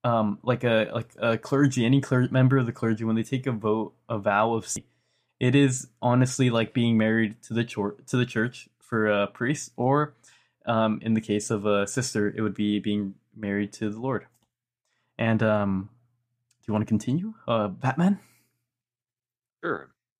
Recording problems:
none

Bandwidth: 15 kHz